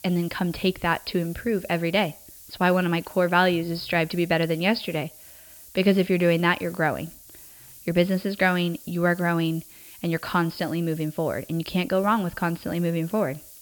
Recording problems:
high frequencies cut off; noticeable; nothing above 5.5 kHz
hiss; noticeable; throughout; 20 dB below the speech

